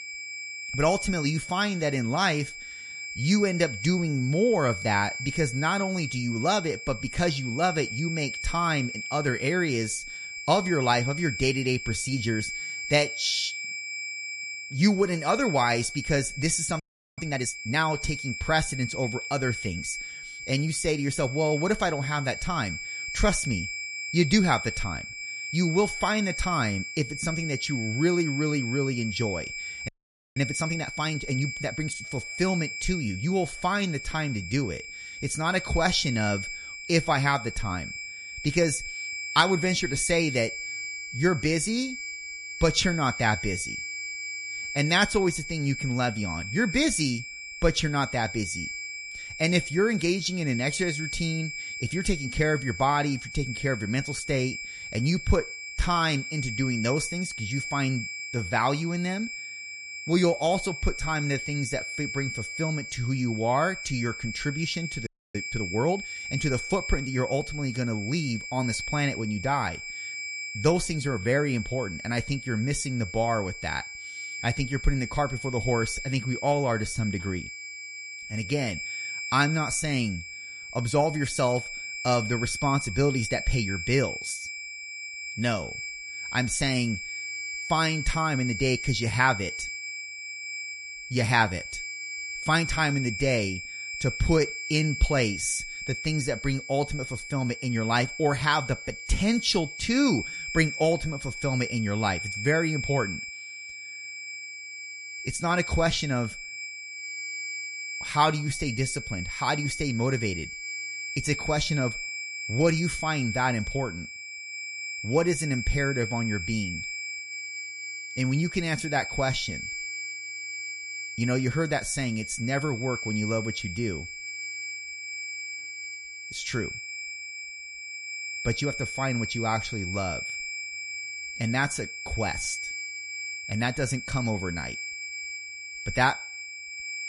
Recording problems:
garbled, watery; slightly; nothing above 11 kHz
high-pitched whine; loud; throughout; 2.5 kHz, 6 dB below the speech
audio freezing; at 17 s, at 30 s and at 1:05

